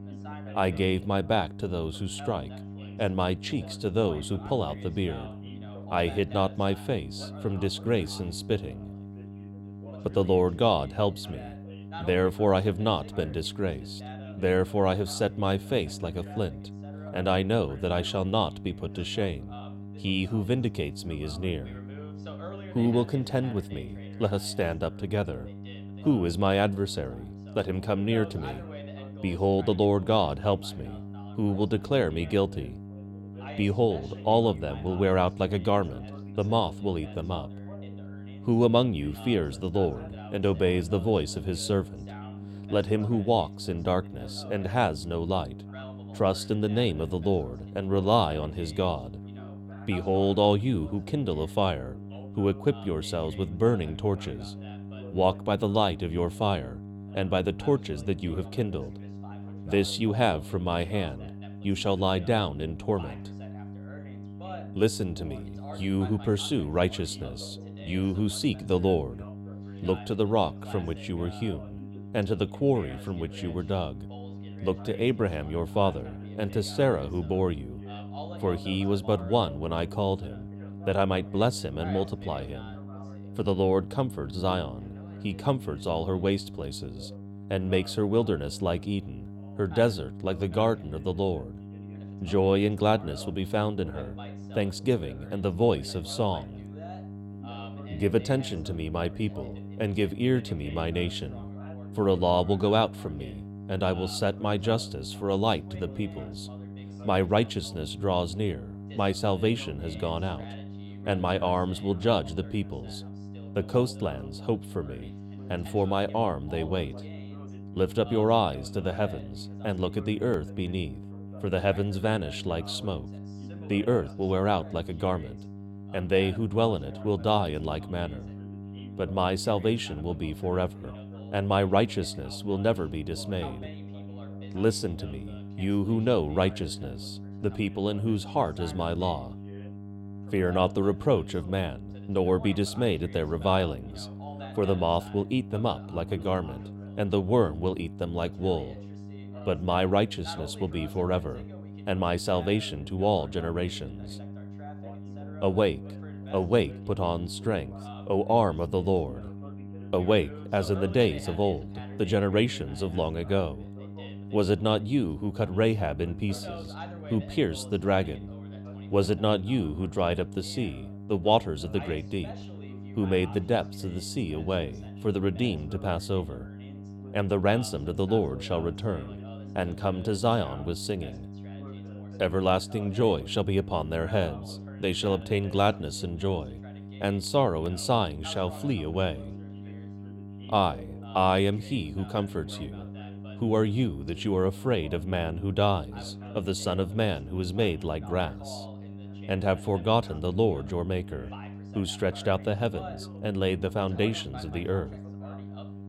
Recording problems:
electrical hum; noticeable; throughout; 50 Hz, 20 dB below the speech
background chatter; faint; throughout; 2 voices, 20 dB below the speech

